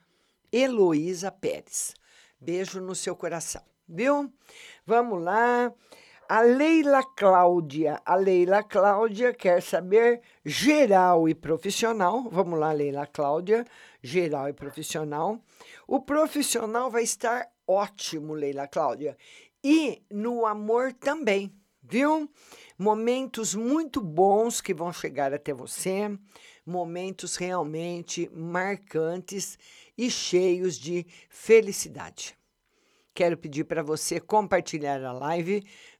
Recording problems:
none

